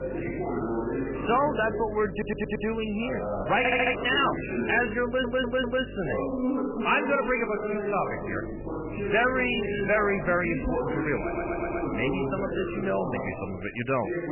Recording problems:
garbled, watery; badly; nothing above 3 kHz
distortion; slight; 10 dB below the speech
background chatter; loud; throughout; 2 voices, 4 dB below the speech
electrical hum; noticeable; until 6.5 s and from 8 to 13 s; 50 Hz, 20 dB below the speech
traffic noise; faint; until 11 s; 20 dB below the speech
audio stuttering; 4 times, first at 2 s

